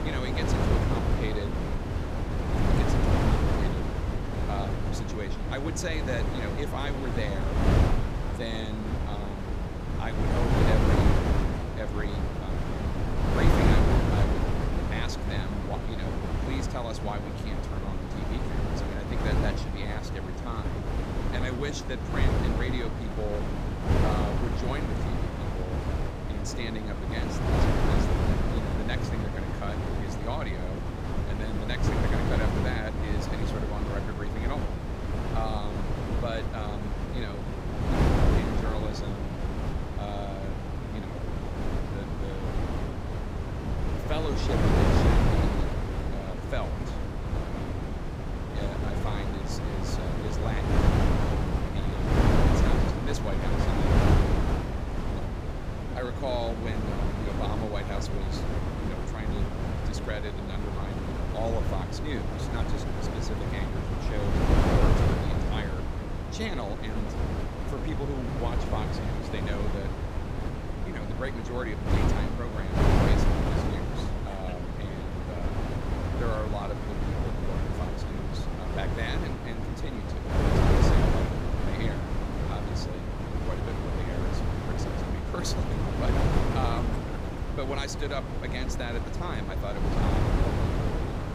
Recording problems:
wind noise on the microphone; heavy; 4 dB above the speech

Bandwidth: 15.5 kHz